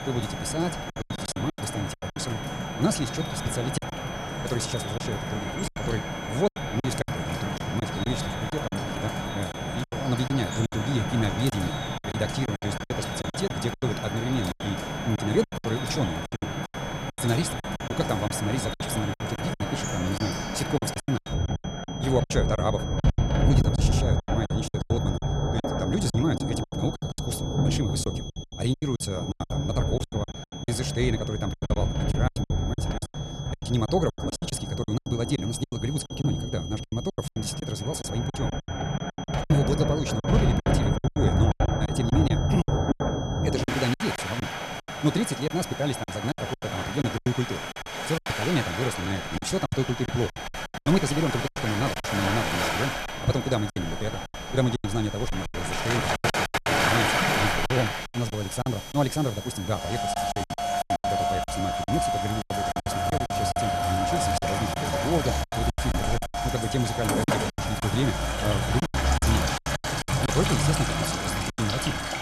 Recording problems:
wrong speed, natural pitch; too fast; 1.5 times normal speed
rain or running water; very loud; throughout; 1 dB above the speech
high-pitched whine; noticeable; throughout; 3.5 kHz, 10 dB below the speech
choppy; very; 13% of the speech affected

